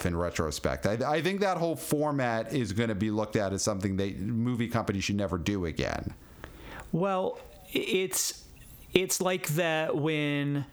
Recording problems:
squashed, flat; heavily

